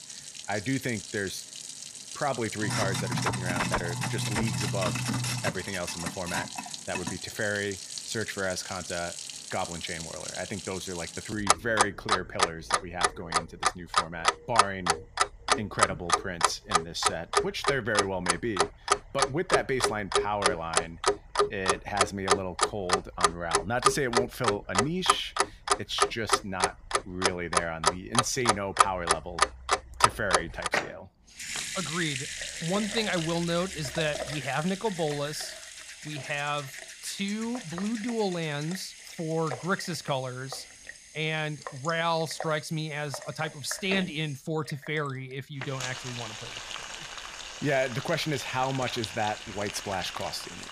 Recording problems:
household noises; very loud; throughout; 2 dB above the speech

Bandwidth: 15 kHz